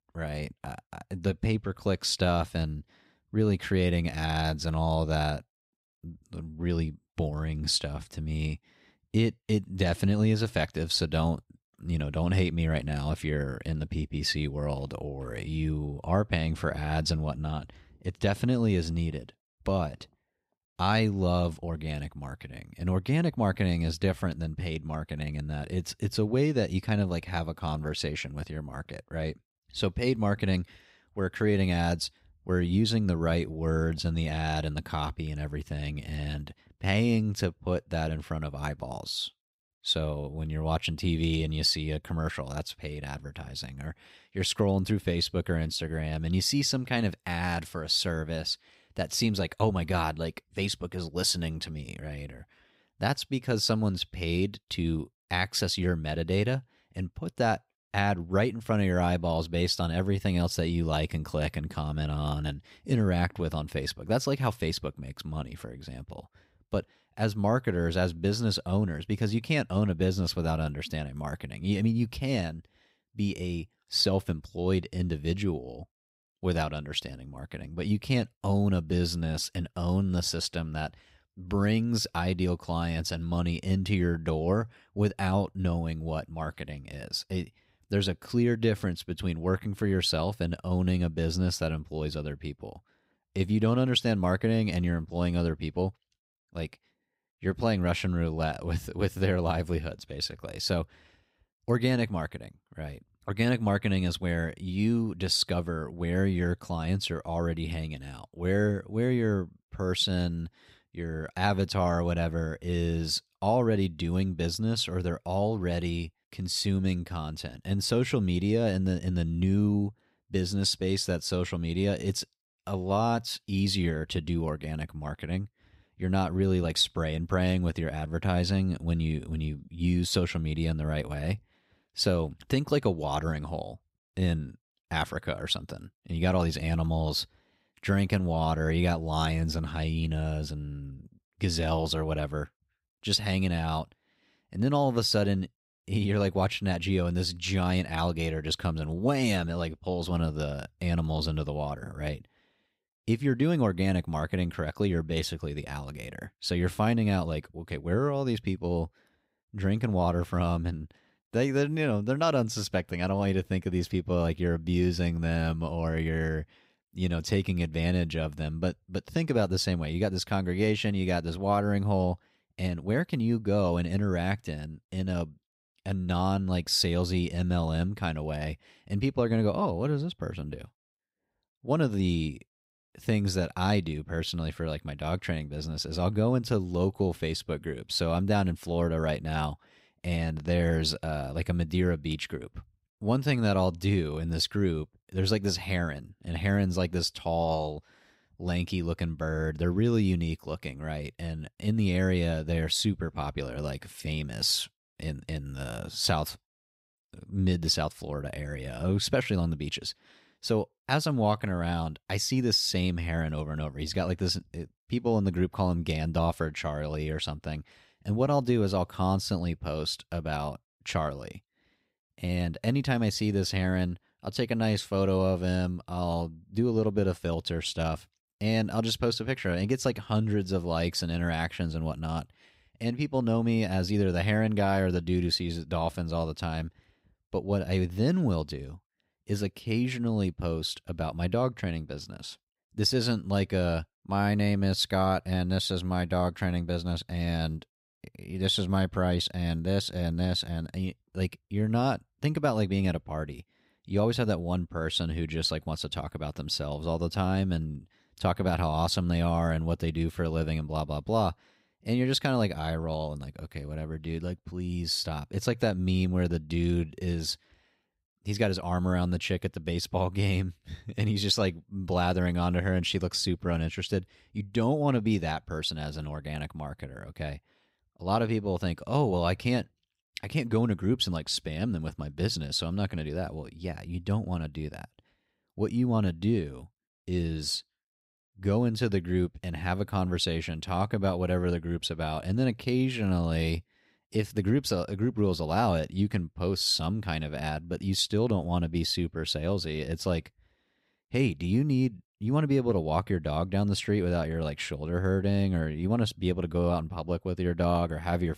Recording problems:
none

